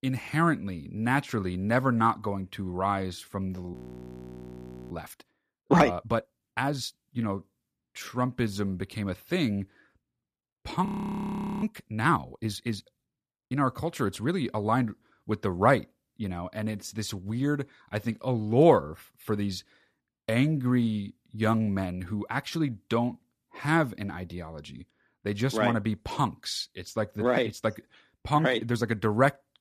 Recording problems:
audio freezing; at 3.5 s for 1 s and at 11 s for 1 s

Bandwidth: 14.5 kHz